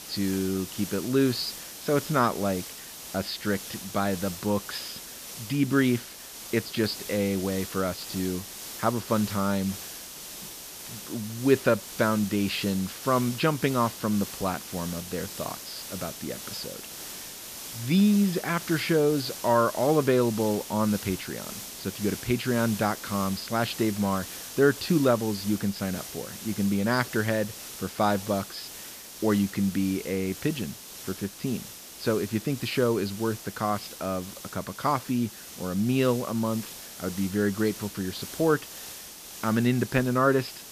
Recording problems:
high frequencies cut off; noticeable; nothing above 5.5 kHz
hiss; noticeable; throughout; 10 dB below the speech

